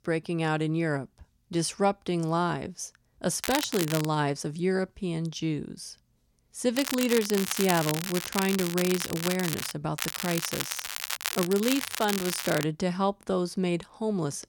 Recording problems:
crackling; loud; at 3.5 s, from 7 to 9.5 s and from 10 to 13 s; 4 dB below the speech

